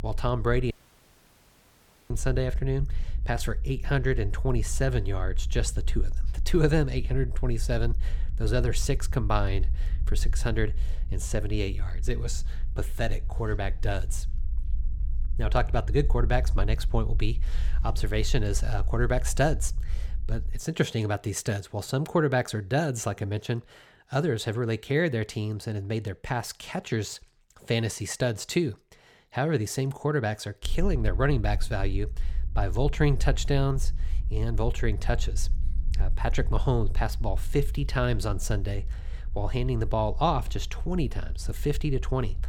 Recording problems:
low rumble; faint; until 21 s and from 31 s on; 25 dB below the speech
audio cutting out; at 0.5 s for 1.5 s

